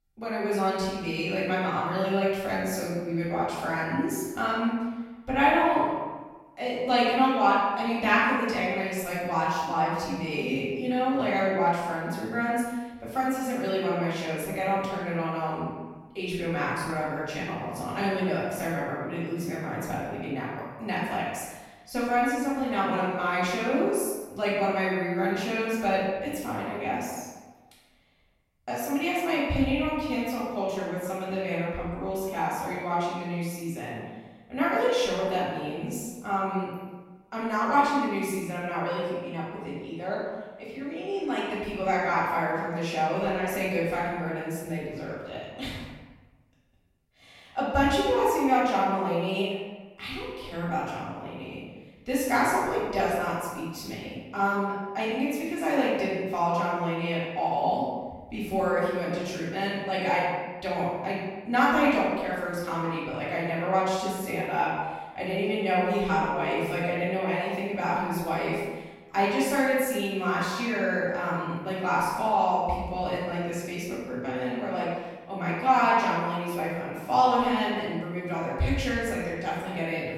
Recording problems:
room echo; strong; dies away in 1.1 s
off-mic speech; far

